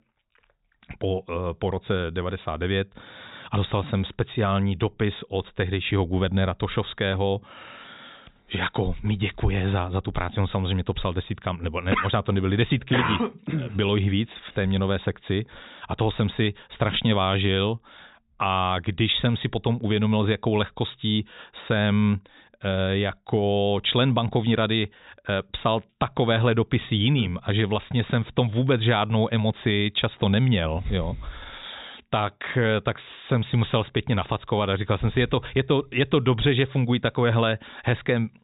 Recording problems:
high frequencies cut off; severe; nothing above 4 kHz

